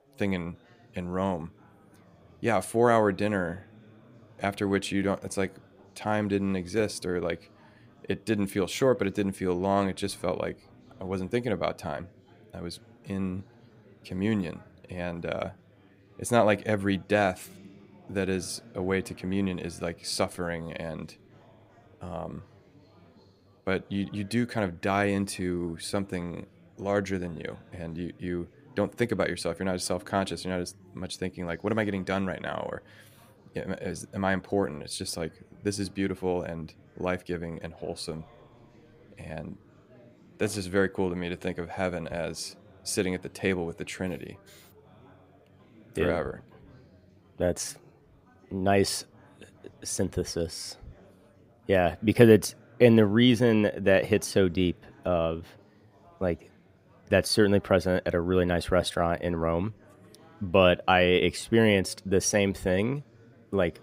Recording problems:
chatter from many people; faint; throughout; 25 dB below the speech

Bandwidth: 15.5 kHz